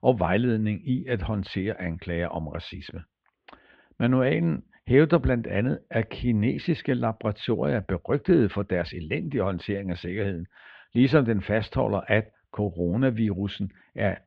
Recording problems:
muffled; very; fading above 3.5 kHz

